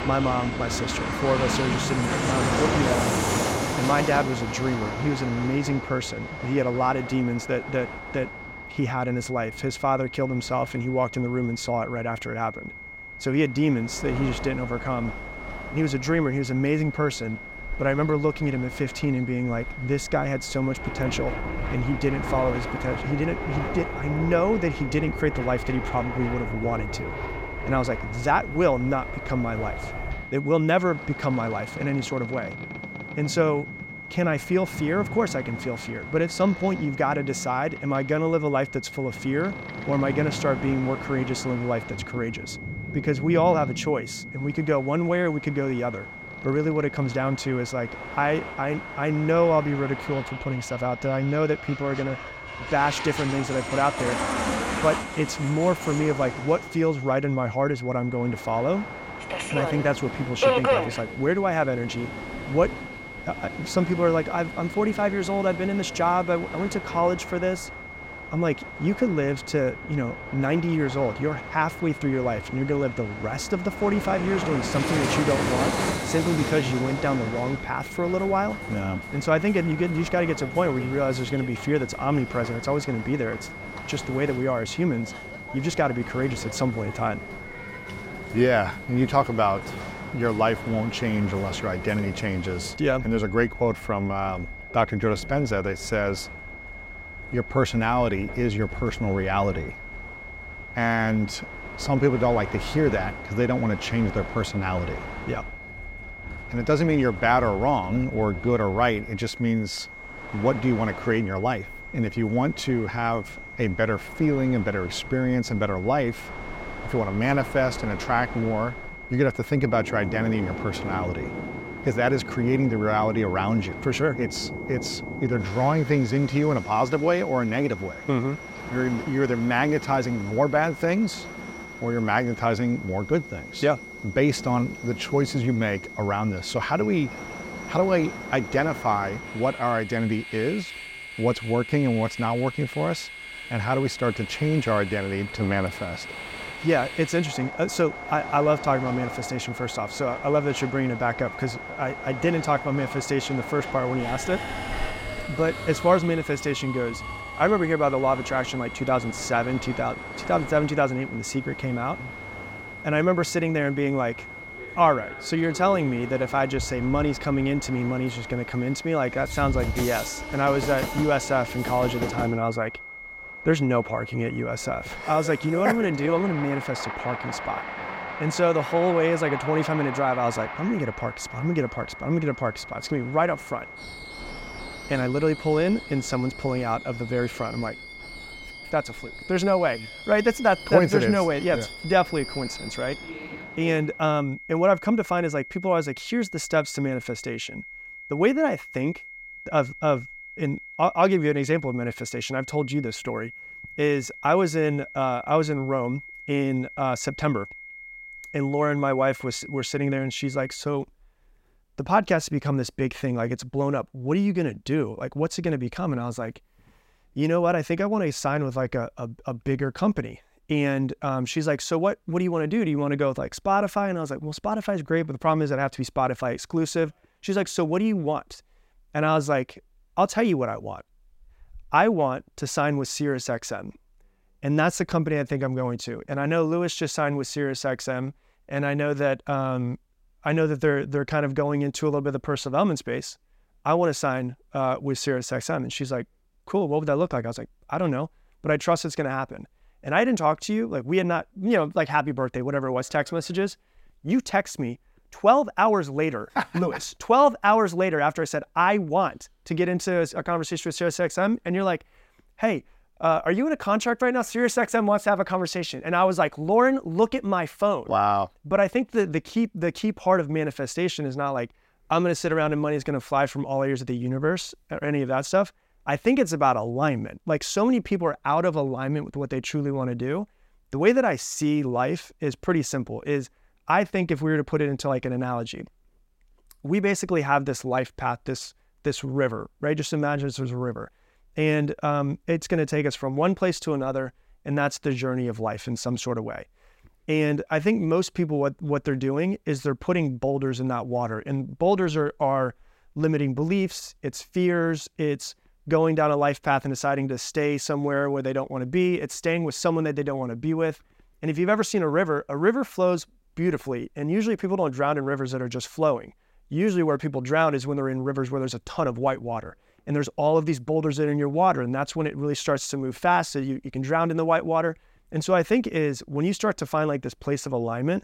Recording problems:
train or aircraft noise; loud; until 3:14; 10 dB below the speech
high-pitched whine; noticeable; until 3:31; 2 kHz, 15 dB below the speech

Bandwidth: 16 kHz